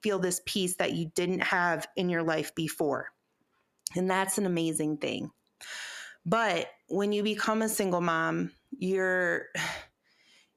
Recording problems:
squashed, flat; heavily

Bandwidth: 14.5 kHz